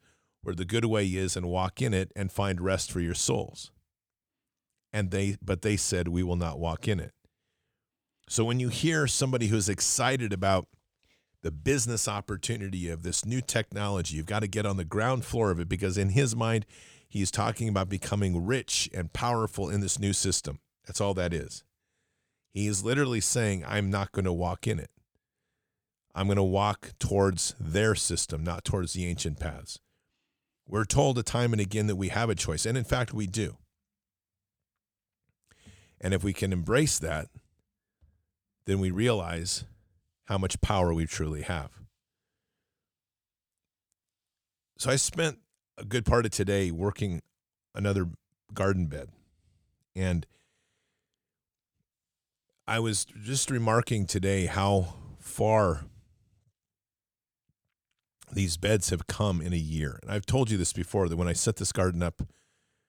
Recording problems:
none

